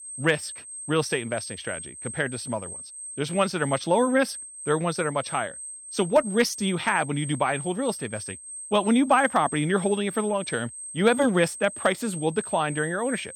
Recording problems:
high-pitched whine; noticeable; throughout; 8.5 kHz, 10 dB below the speech

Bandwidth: 18 kHz